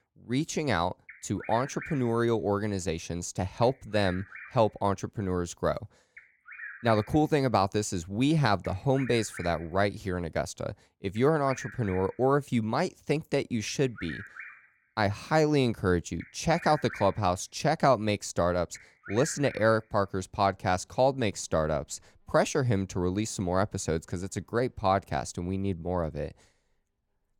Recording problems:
animal sounds; noticeable; throughout; 15 dB below the speech

